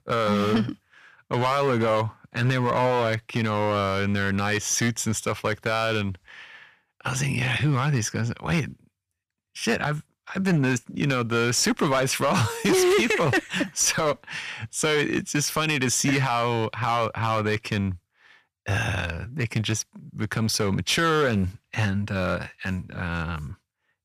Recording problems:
distortion; slight; 6% of the sound clipped

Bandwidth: 14.5 kHz